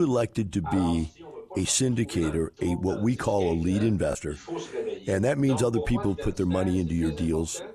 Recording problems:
voice in the background; noticeable; throughout; 10 dB below the speech
abrupt cut into speech; at the start

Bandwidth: 14.5 kHz